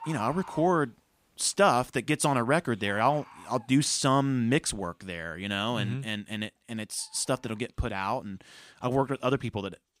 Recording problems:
animal sounds; noticeable; throughout; 20 dB below the speech

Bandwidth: 15.5 kHz